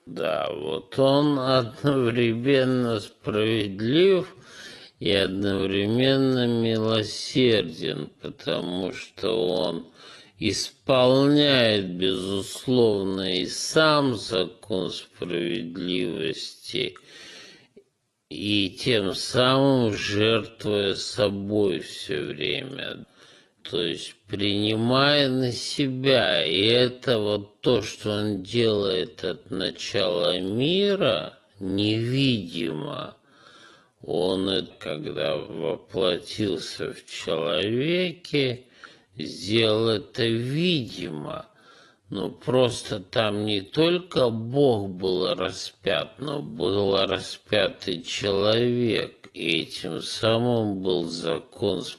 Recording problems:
wrong speed, natural pitch; too slow; 0.5 times normal speed
garbled, watery; slightly; nothing above 11.5 kHz

